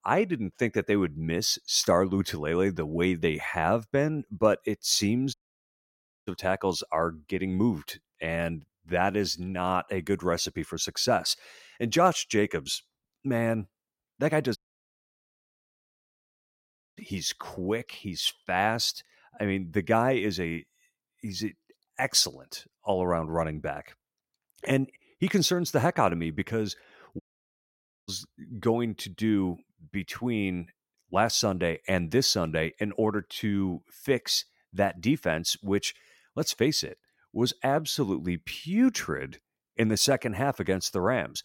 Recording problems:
audio cutting out; at 5.5 s for 1 s, at 15 s for 2.5 s and at 27 s for 1 s

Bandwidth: 16.5 kHz